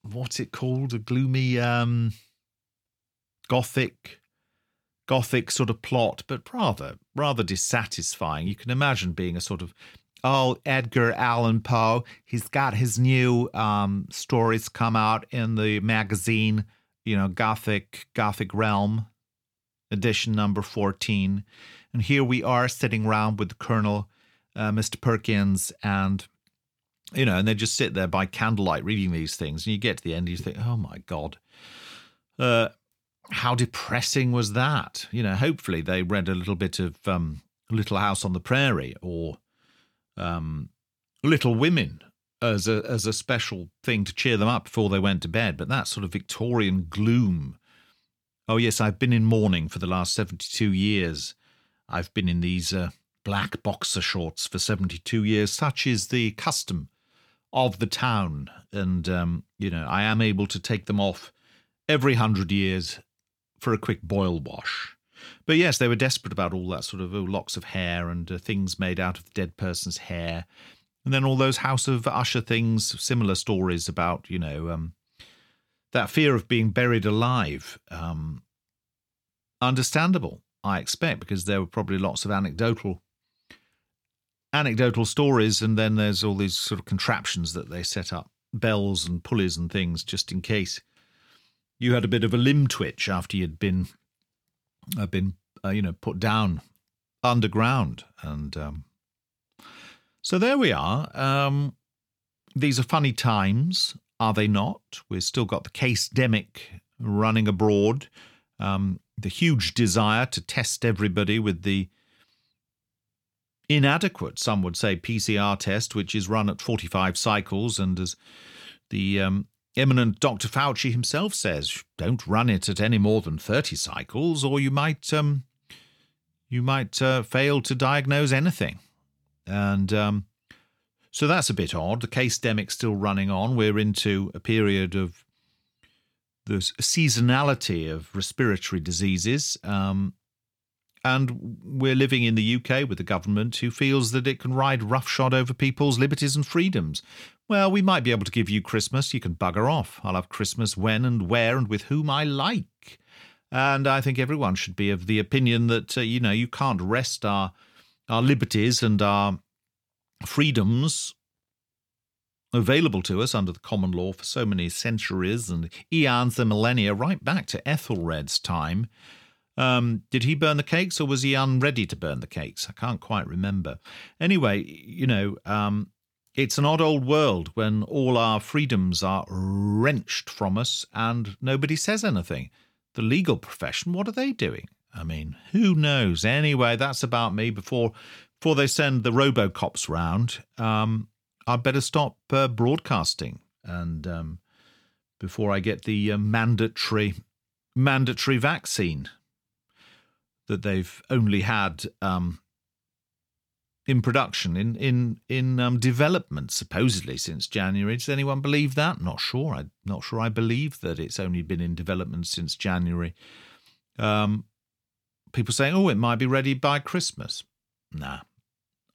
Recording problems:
none

